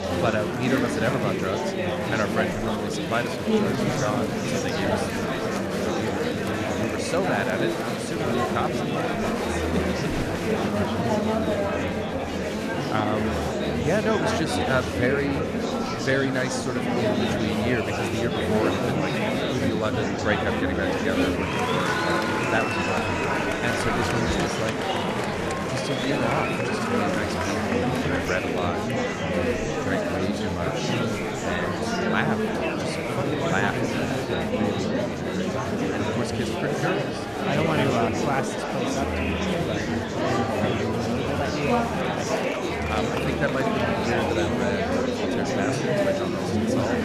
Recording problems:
murmuring crowd; very loud; throughout; 5 dB above the speech

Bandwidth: 14 kHz